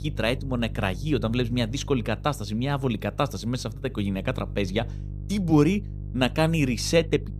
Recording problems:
electrical hum; faint; throughout; 50 Hz, 20 dB below the speech

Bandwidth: 15 kHz